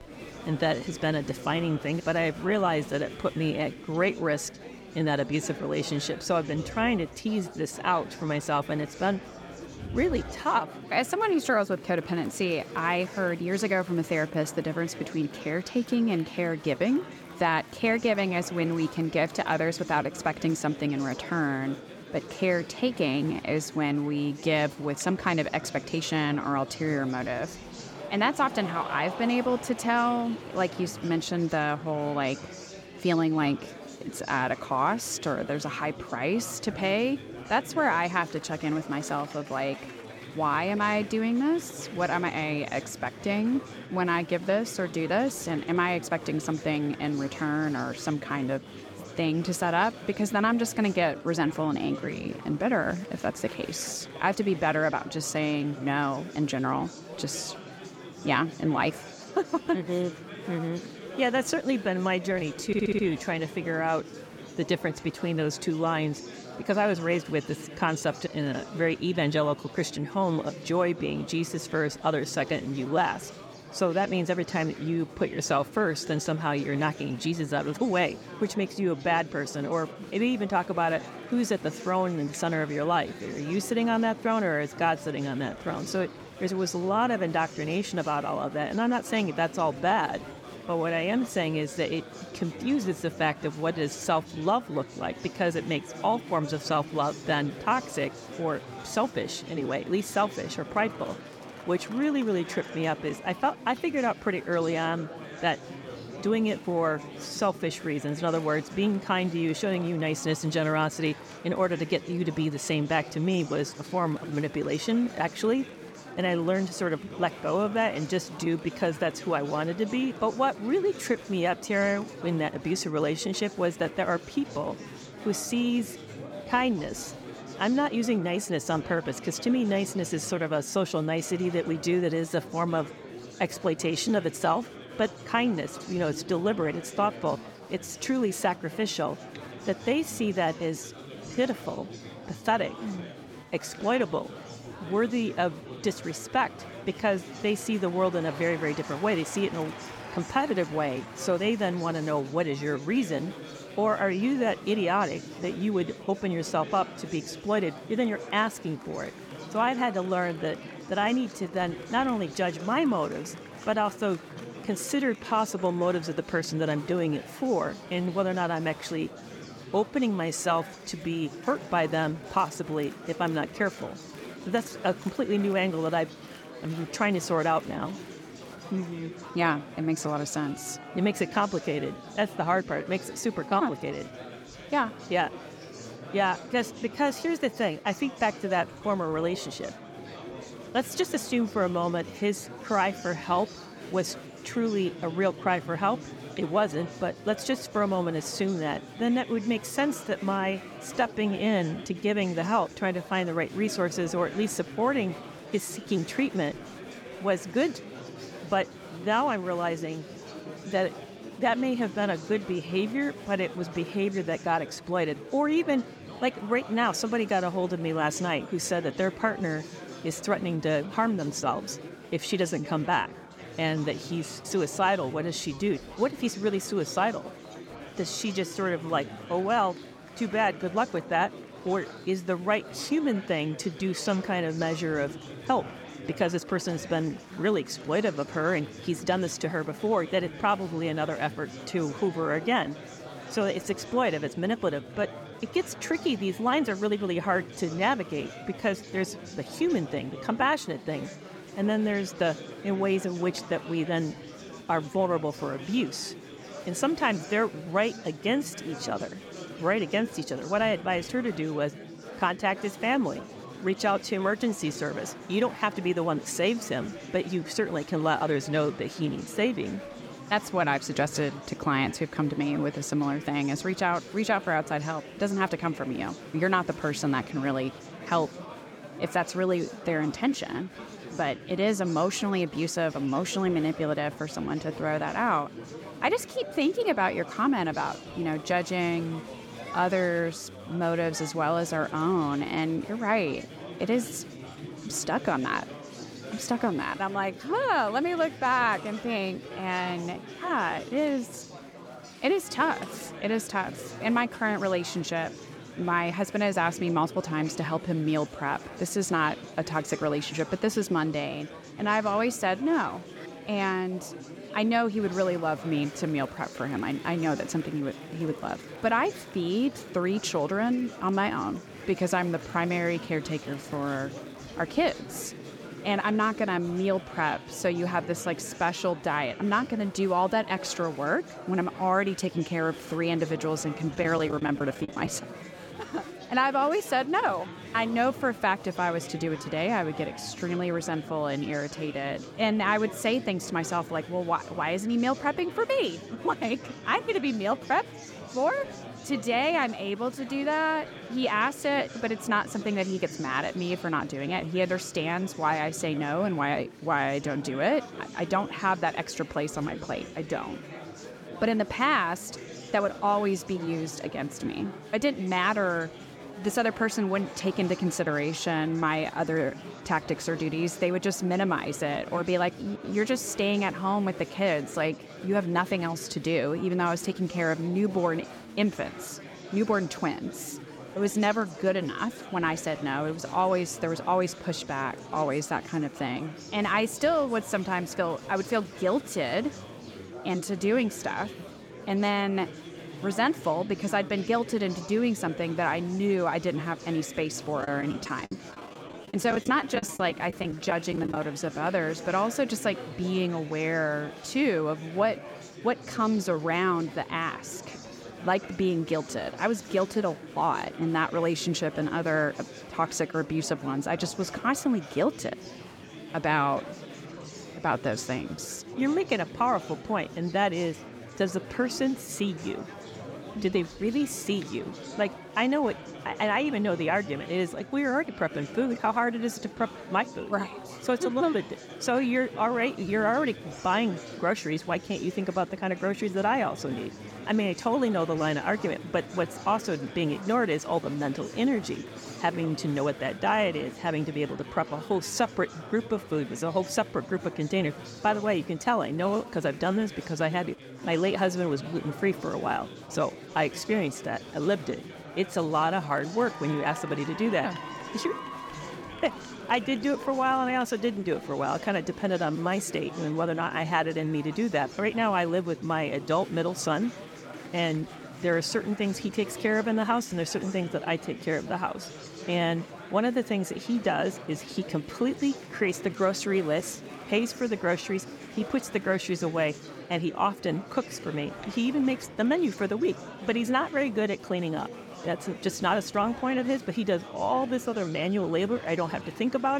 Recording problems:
chatter from many people; noticeable; throughout; 15 dB below the speech
audio stuttering; at 1:03
choppy; very; from 5:34 to 5:35 and from 6:38 to 6:41; 17% of the speech affected
abrupt cut into speech; at the end

